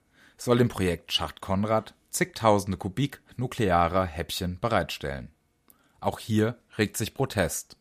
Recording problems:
none

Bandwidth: 14.5 kHz